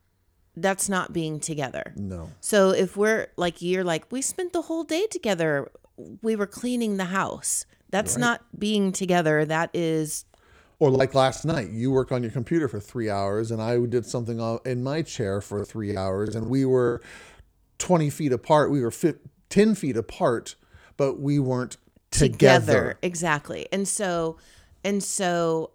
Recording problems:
choppy; very; from 8.5 to 12 s and from 16 to 17 s; 9% of the speech affected

